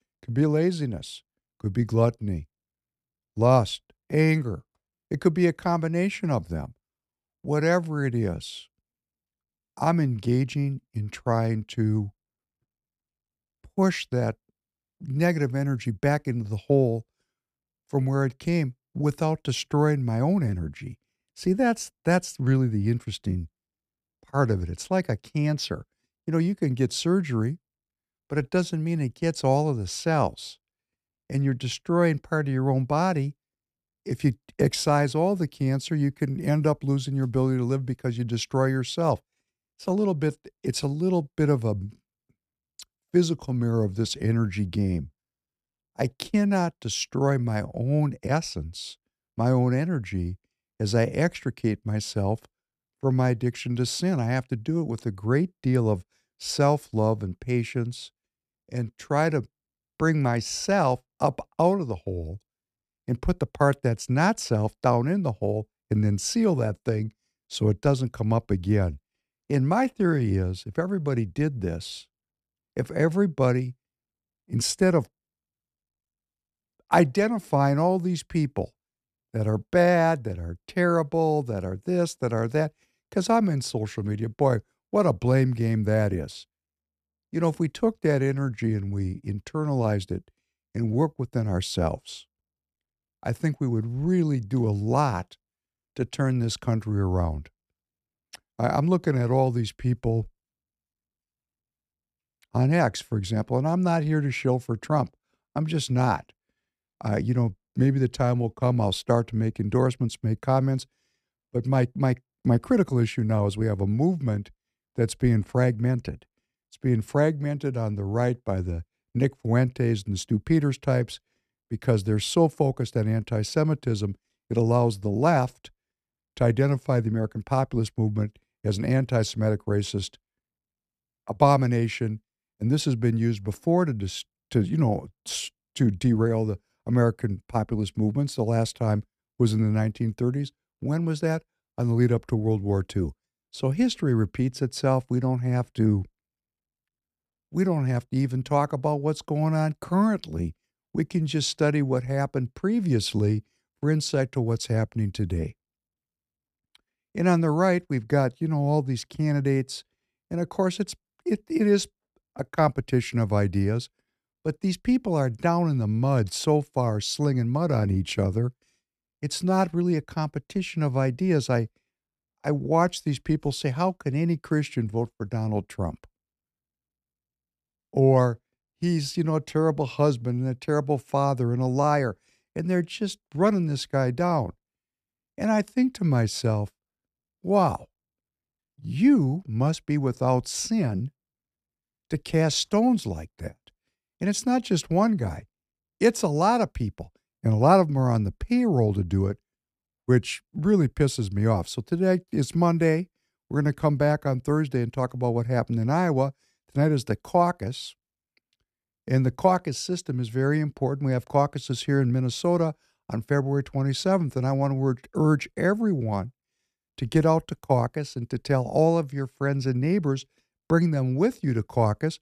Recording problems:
none

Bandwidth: 14.5 kHz